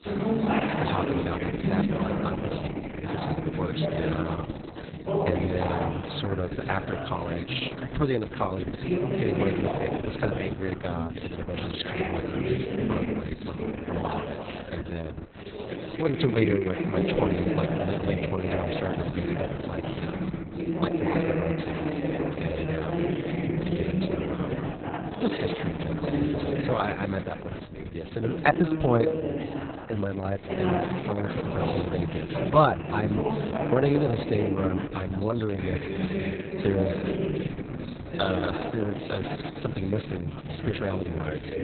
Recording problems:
garbled, watery; badly; nothing above 4 kHz
chatter from many people; loud; throughout; 1 dB below the speech

